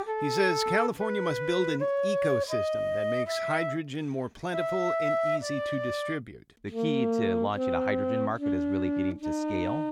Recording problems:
background music; very loud; throughout; 3 dB above the speech

